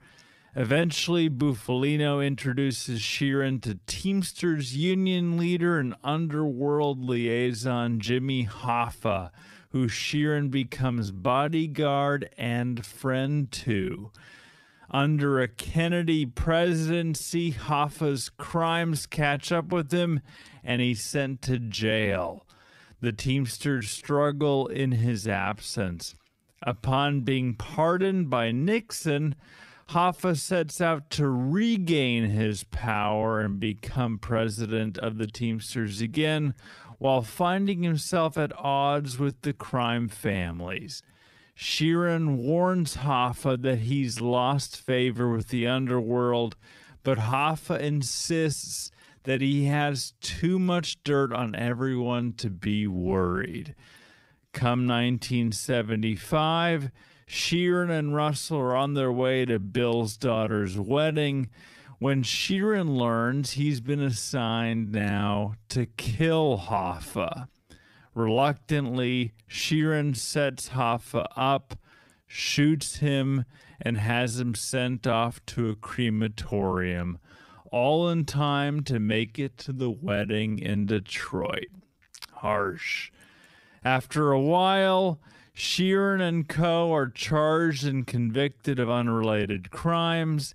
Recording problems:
wrong speed, natural pitch; too slow; 0.6 times normal speed

